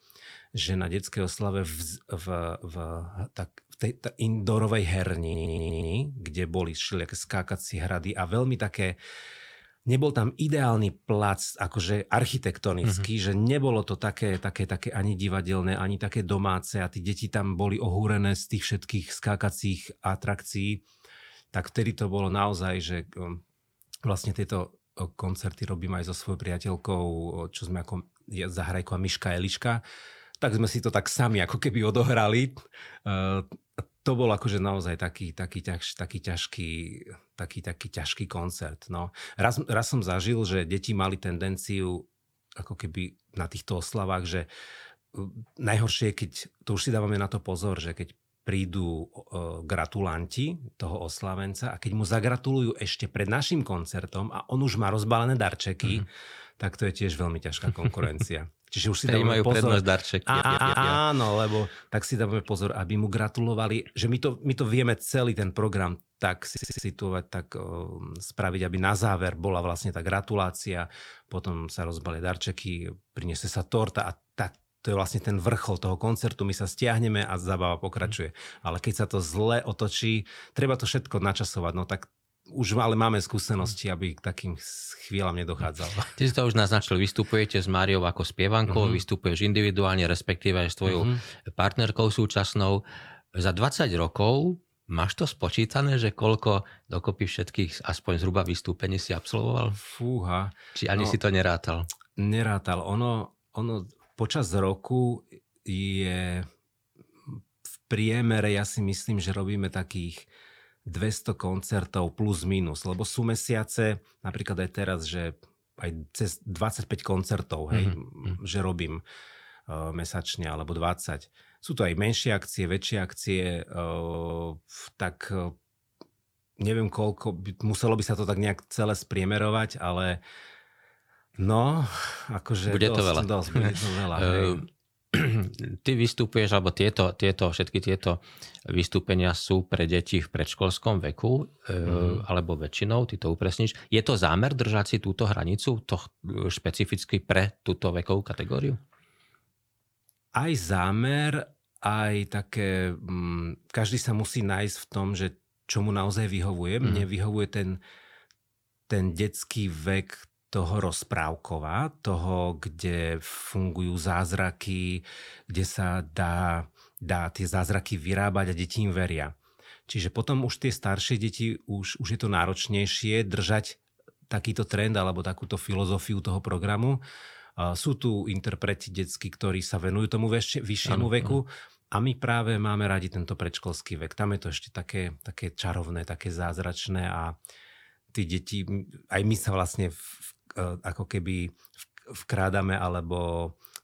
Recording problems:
audio stuttering; 4 times, first at 5 s

